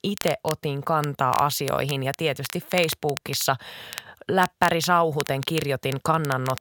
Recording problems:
crackle, like an old record; noticeable; 15 dB below the speech

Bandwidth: 18 kHz